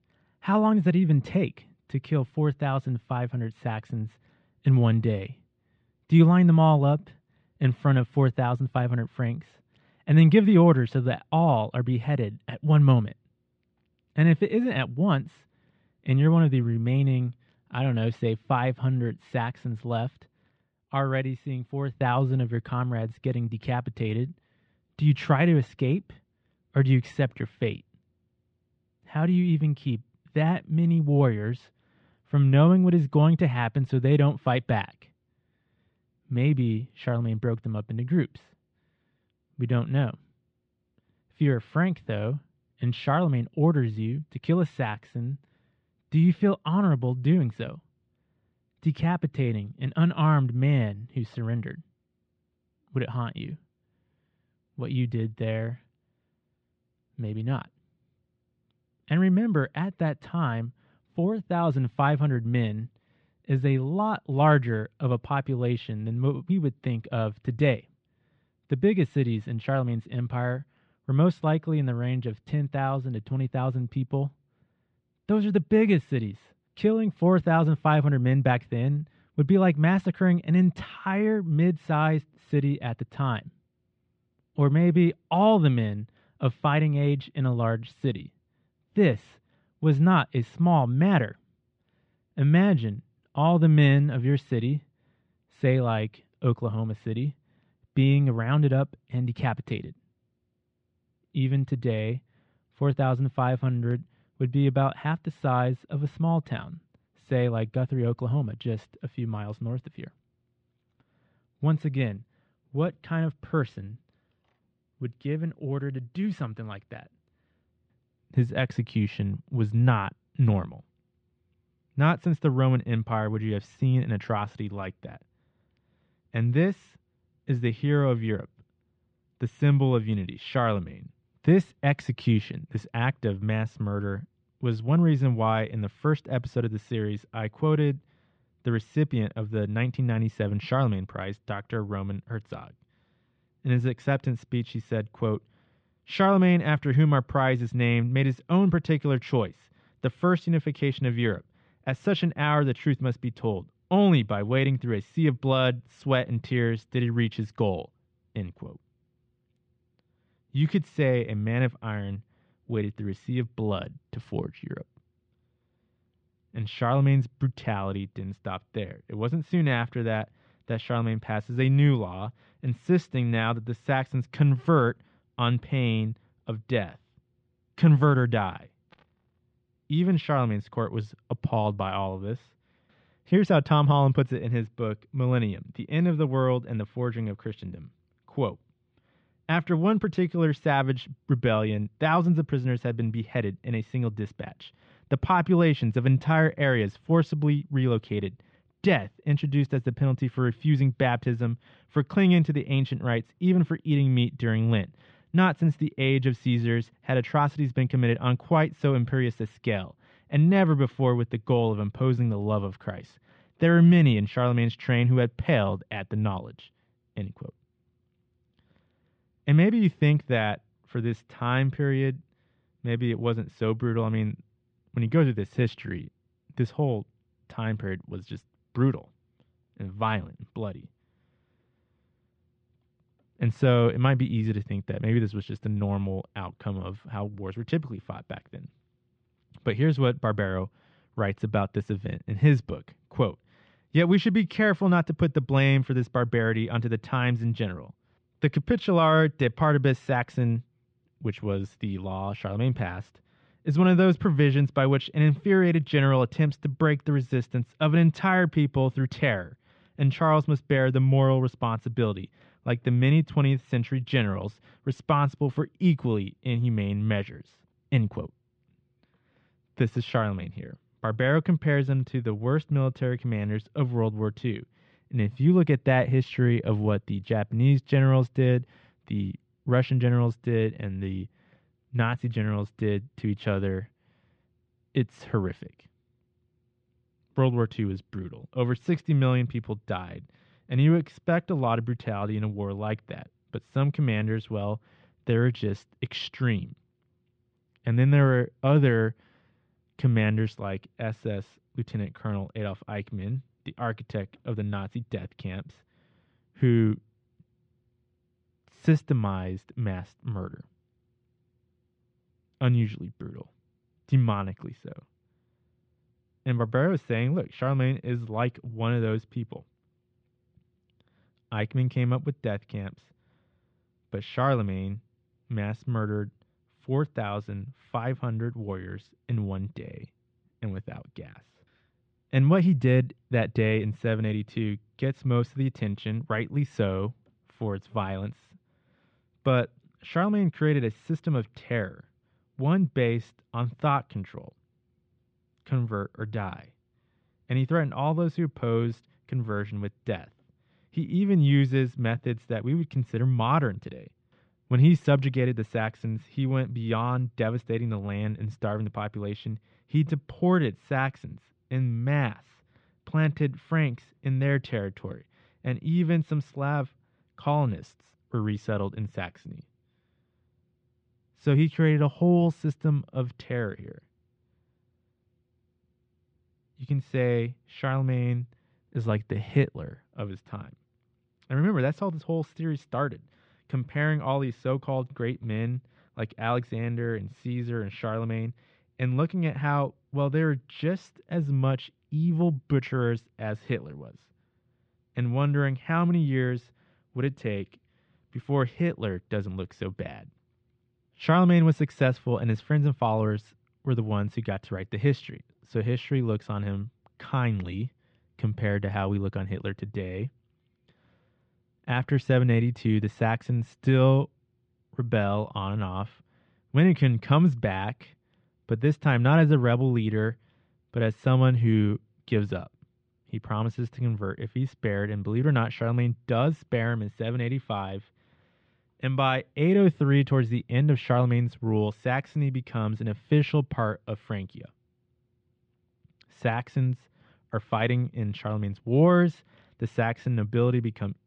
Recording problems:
muffled; slightly; fading above 4 kHz

